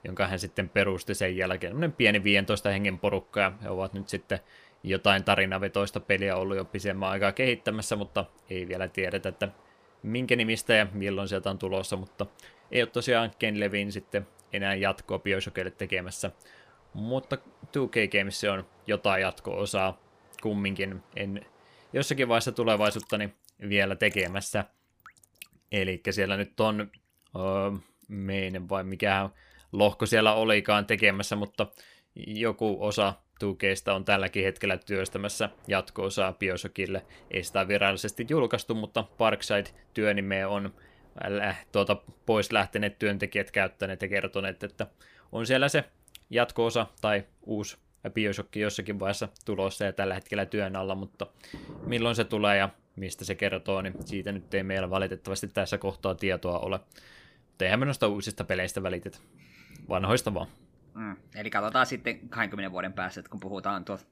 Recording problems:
rain or running water; faint; throughout; 25 dB below the speech

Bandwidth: 15 kHz